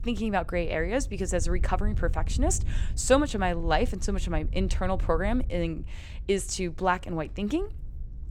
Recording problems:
wind noise on the microphone; occasional gusts; 25 dB below the speech

